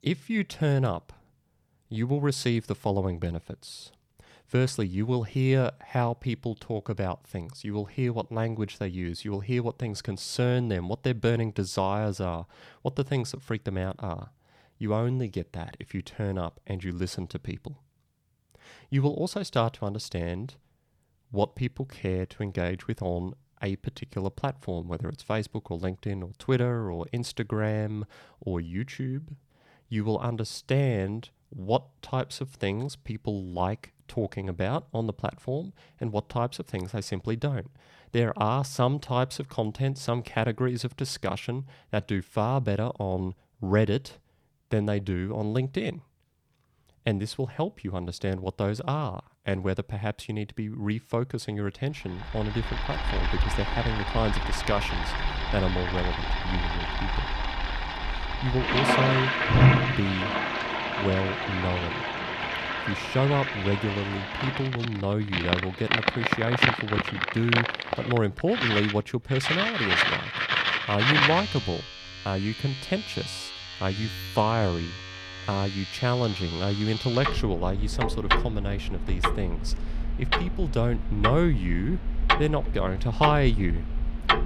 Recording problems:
household noises; very loud; from 53 s on; 2 dB above the speech

